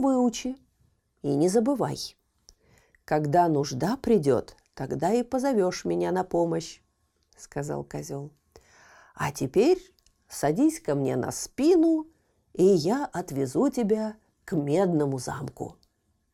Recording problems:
abrupt cut into speech; at the start

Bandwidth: 18 kHz